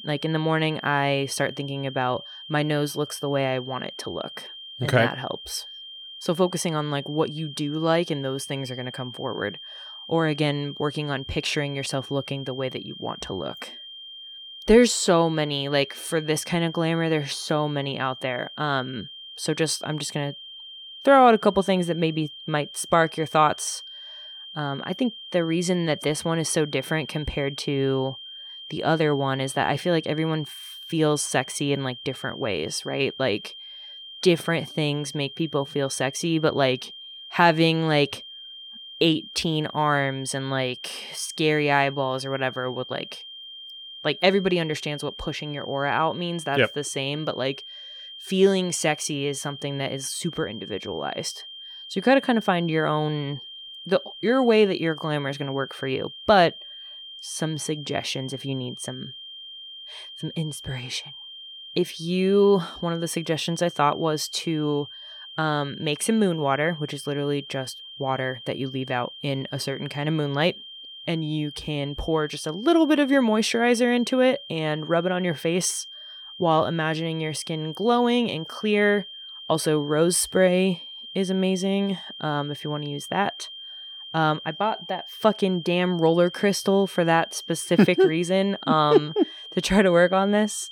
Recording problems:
high-pitched whine; noticeable; throughout; 3 kHz, 15 dB below the speech

